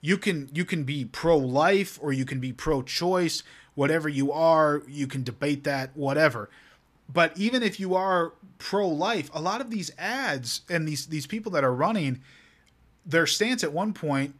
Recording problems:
none

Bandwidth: 14.5 kHz